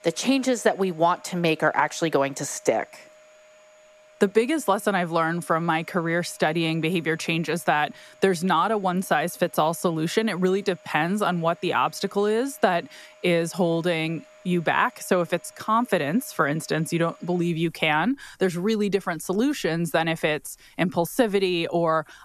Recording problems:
household noises; faint; throughout; 30 dB below the speech

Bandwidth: 13.5 kHz